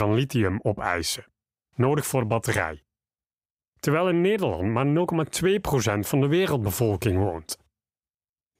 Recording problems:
abrupt cut into speech; at the start

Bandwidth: 15.5 kHz